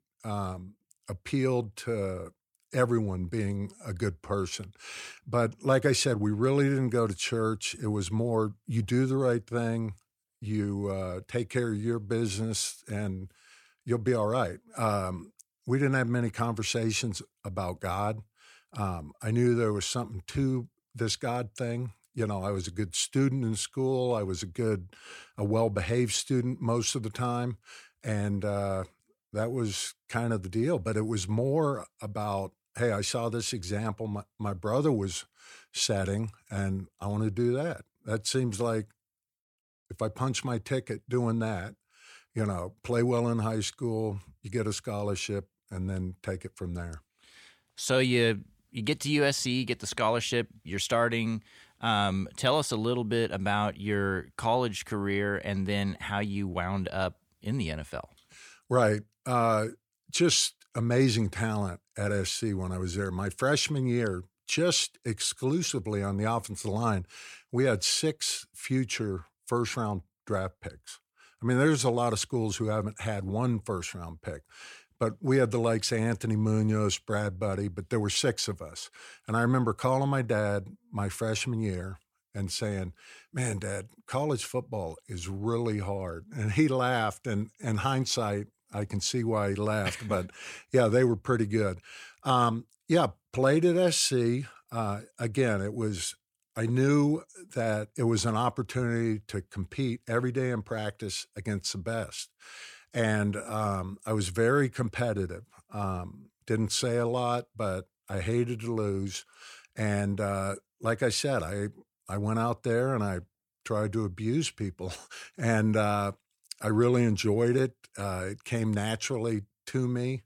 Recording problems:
none

